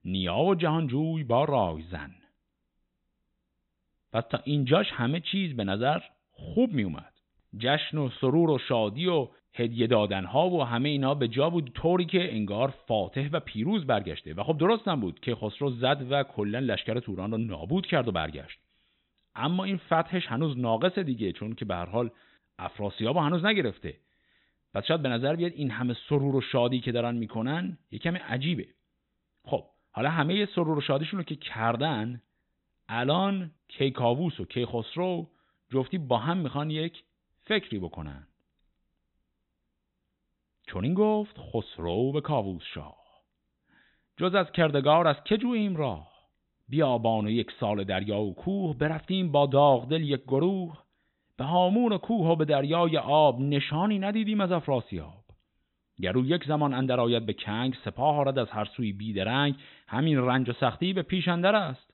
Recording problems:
high frequencies cut off; severe; nothing above 4 kHz

